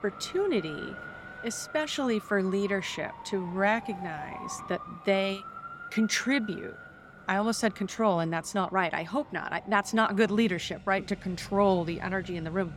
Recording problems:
traffic noise; noticeable; throughout; 15 dB below the speech

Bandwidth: 16.5 kHz